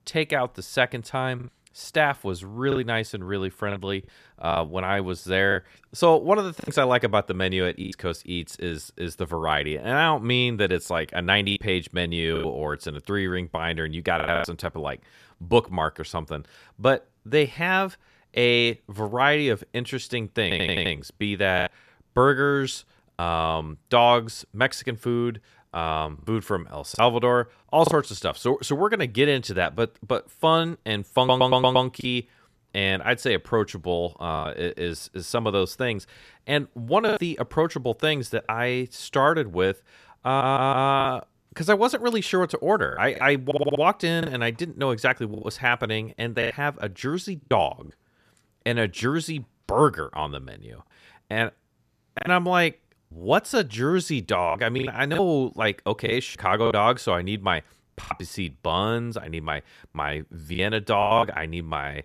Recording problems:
choppy; occasionally; 4% of the speech affected
audio stuttering; 4 times, first at 20 s

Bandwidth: 14.5 kHz